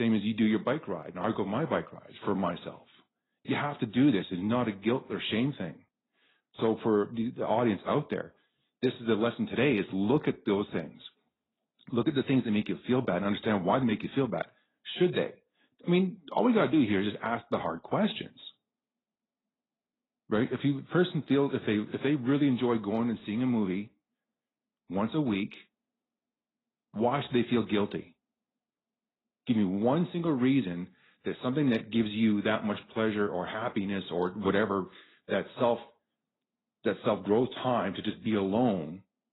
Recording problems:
garbled, watery; badly; nothing above 4 kHz
abrupt cut into speech; at the start

